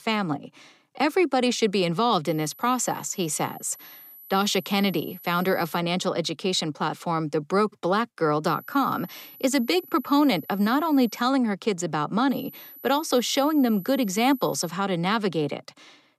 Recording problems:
high-pitched whine; noticeable; from 2.5 to 6 s, from 8.5 to 11 s and from 12 to 15 s; 12 kHz, 20 dB below the speech

